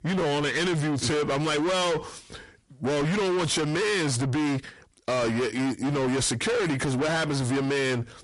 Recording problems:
distortion; heavy; 6 dB below the speech
garbled, watery; slightly; nothing above 10.5 kHz

